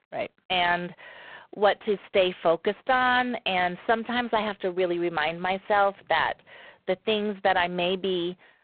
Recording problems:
phone-call audio; poor line

